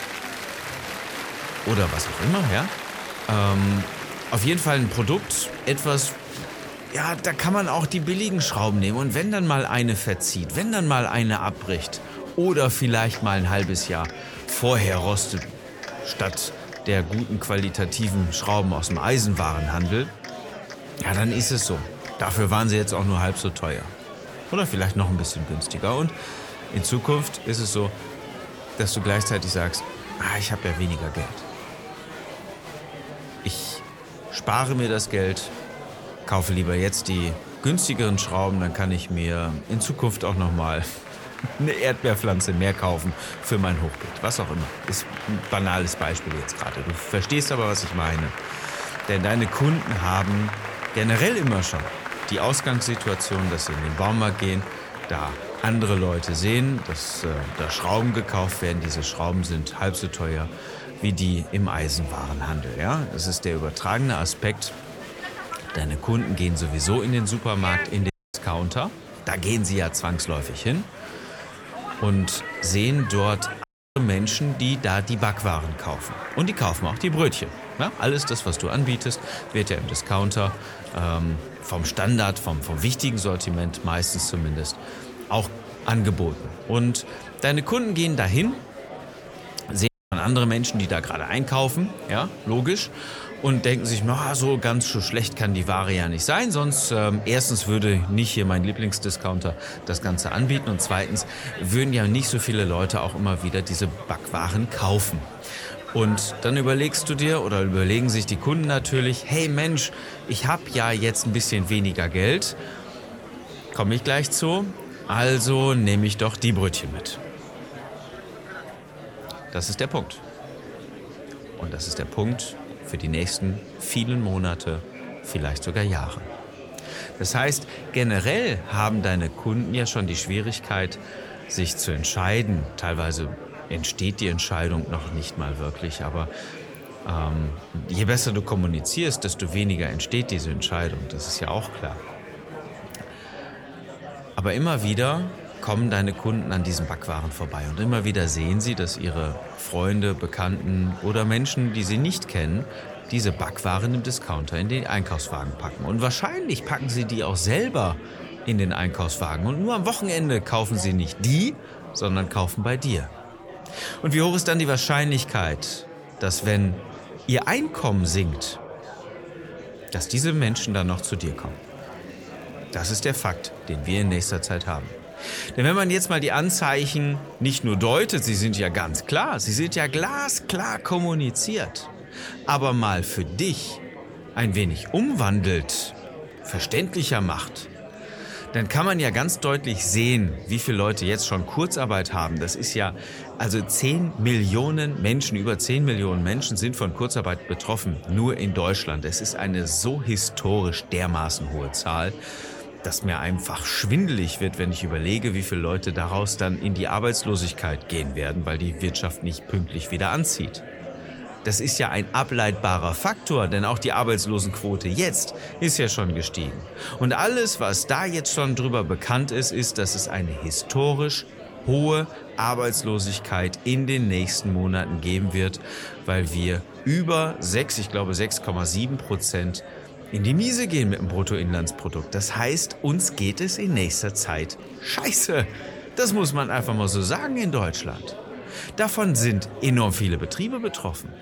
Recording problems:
murmuring crowd; noticeable; throughout; 15 dB below the speech
audio cutting out; at 1:08, at 1:14 and at 1:30

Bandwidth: 18.5 kHz